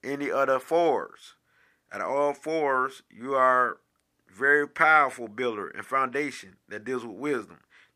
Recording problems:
none

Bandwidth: 15 kHz